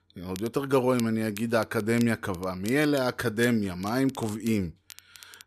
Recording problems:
crackle, like an old record; noticeable; 20 dB below the speech

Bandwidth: 14 kHz